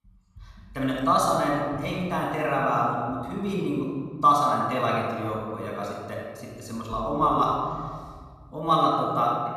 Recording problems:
off-mic speech; far
room echo; noticeable; dies away in 1.7 s

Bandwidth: 14.5 kHz